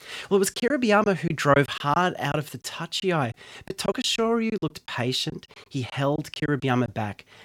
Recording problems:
choppy; very; 10% of the speech affected

